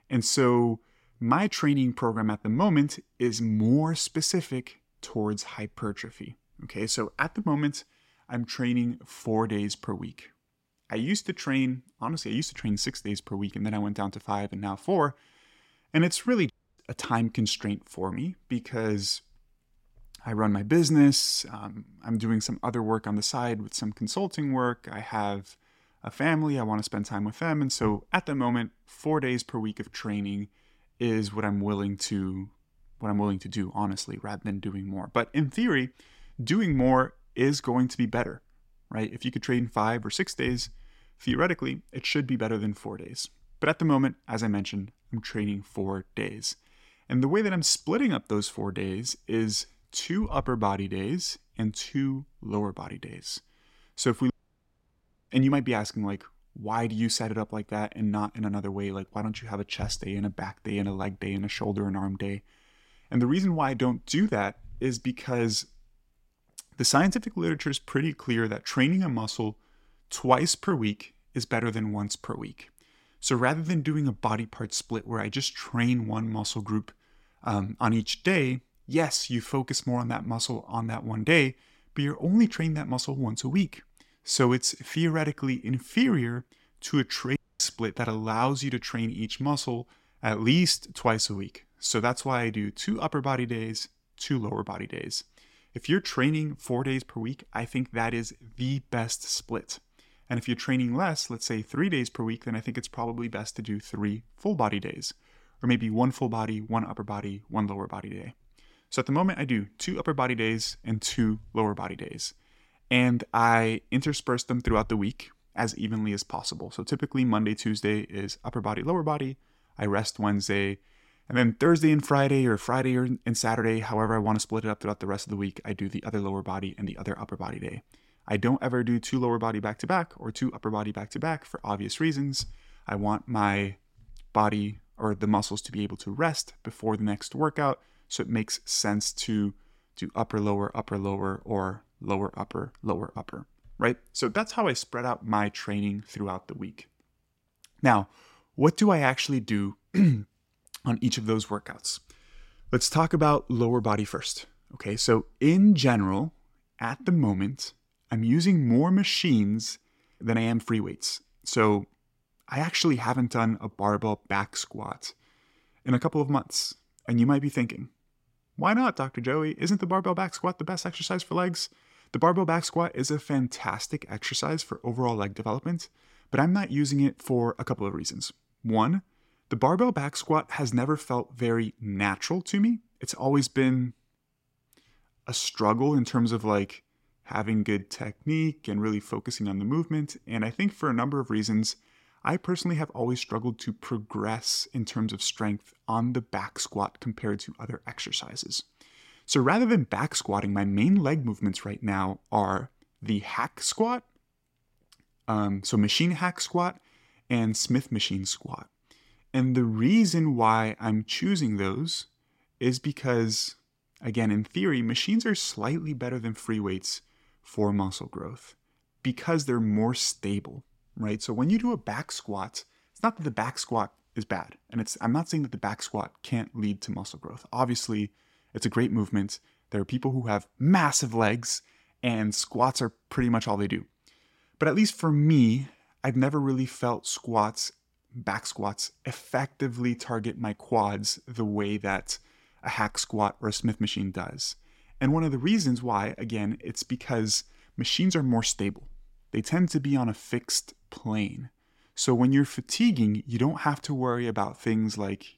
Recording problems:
audio cutting out; at 17 s, at 54 s for 1 s and at 1:27

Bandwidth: 16 kHz